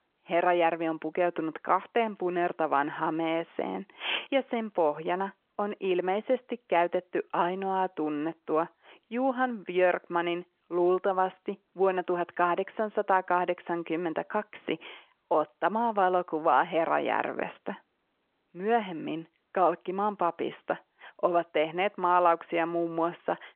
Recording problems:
phone-call audio

